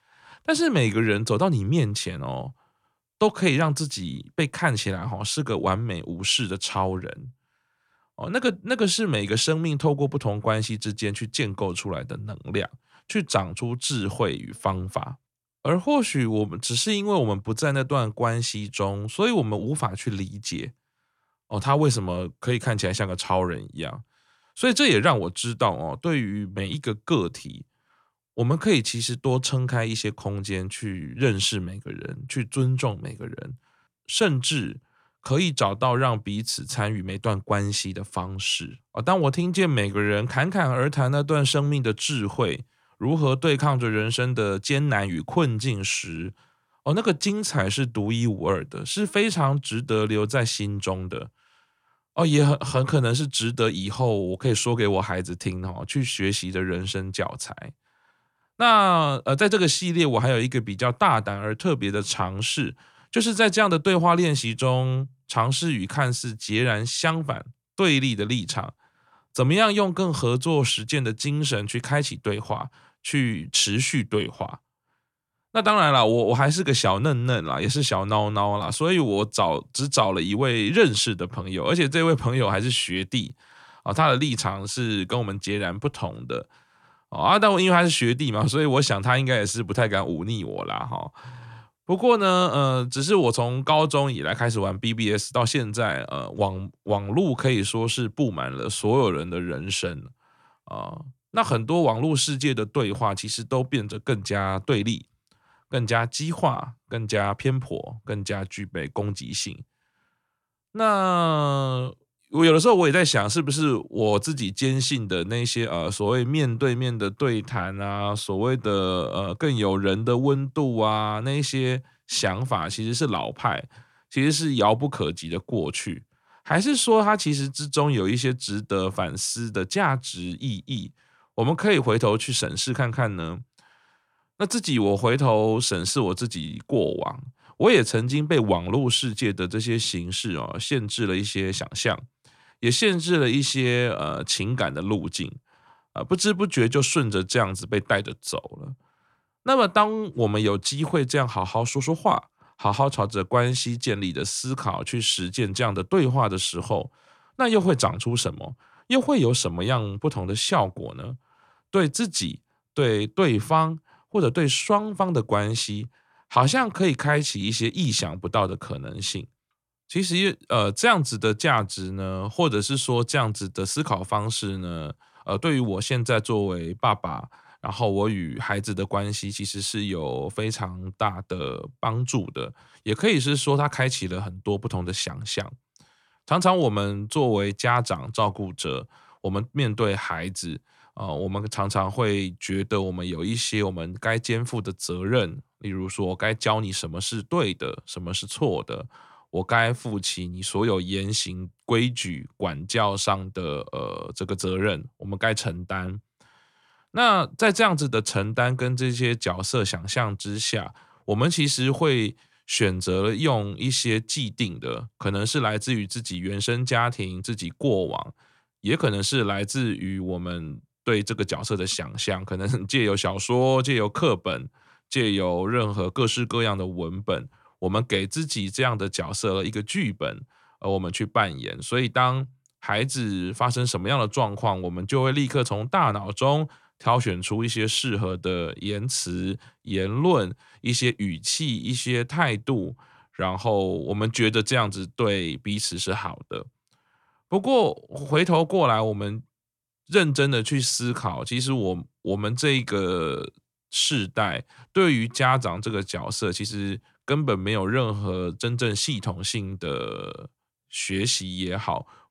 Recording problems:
none

